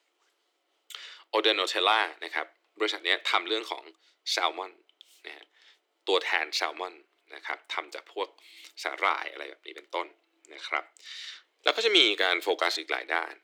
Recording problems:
thin; very; fading below 350 Hz

